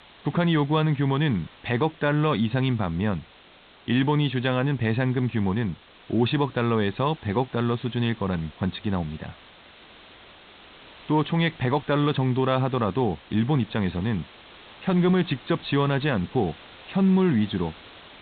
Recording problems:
high frequencies cut off; severe; nothing above 4 kHz
hiss; faint; throughout; 25 dB below the speech

